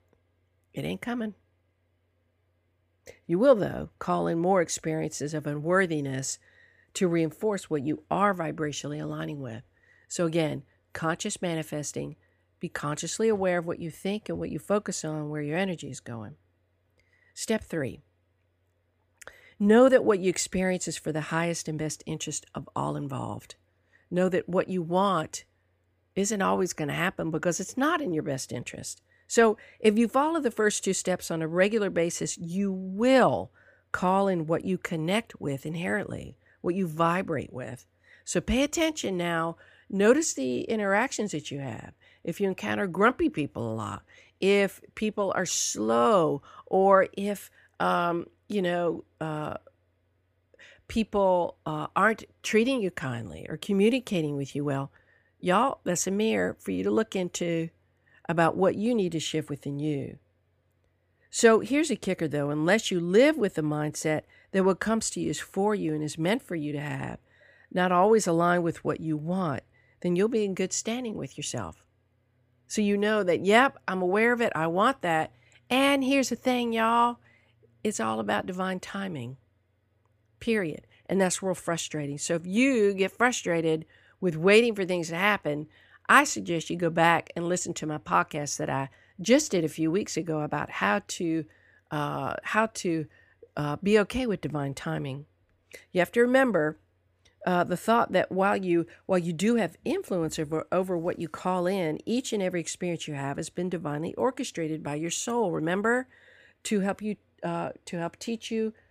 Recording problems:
none

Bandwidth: 15 kHz